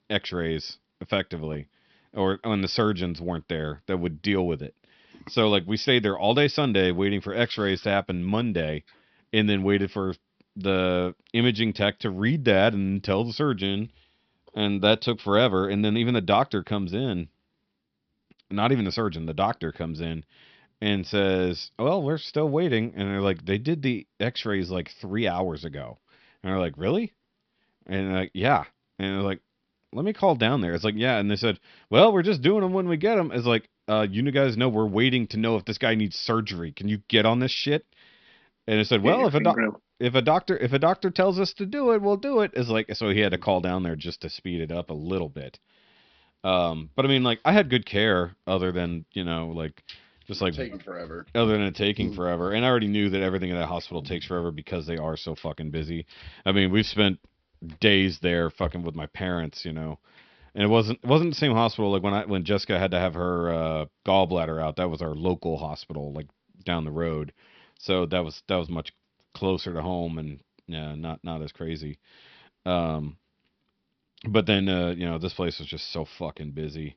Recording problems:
high frequencies cut off; noticeable; nothing above 5.5 kHz

